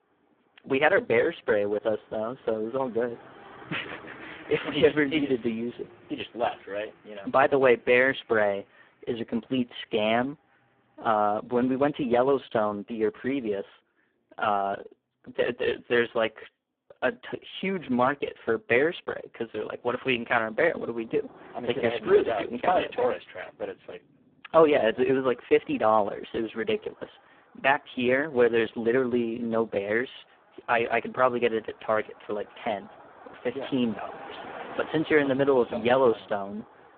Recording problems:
phone-call audio; poor line
traffic noise; faint; throughout; 20 dB below the speech

